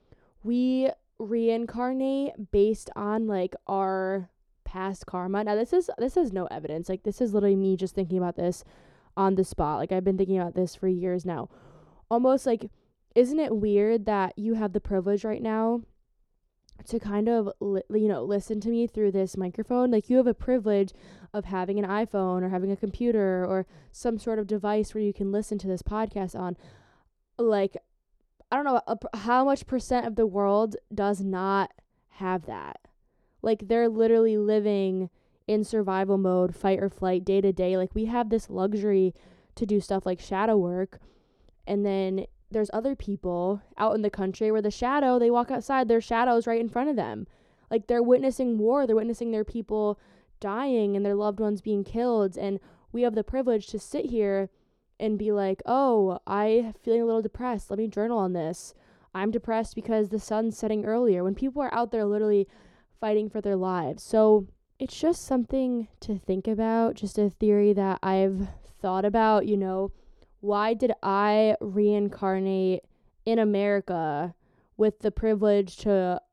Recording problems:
muffled; slightly; fading above 1.5 kHz

